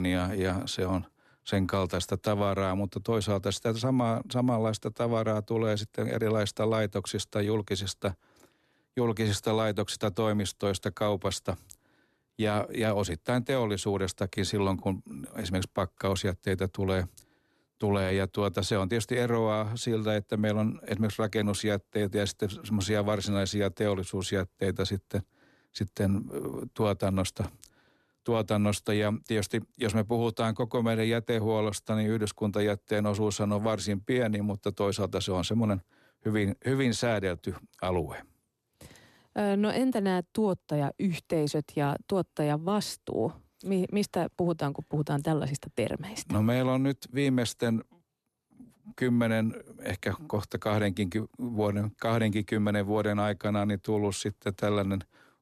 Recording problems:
abrupt cut into speech; at the start

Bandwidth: 13.5 kHz